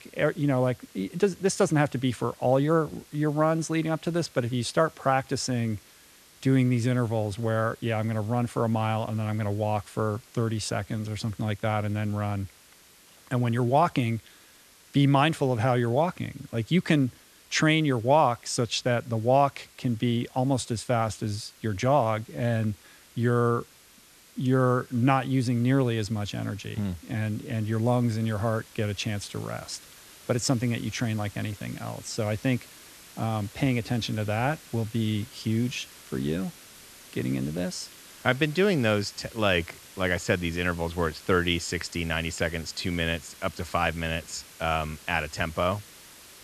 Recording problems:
hiss; faint; throughout; 20 dB below the speech

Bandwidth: 13.5 kHz